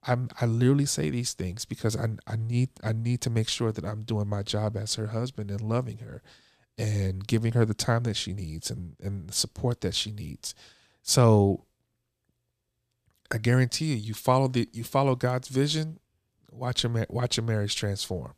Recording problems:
none

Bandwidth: 14.5 kHz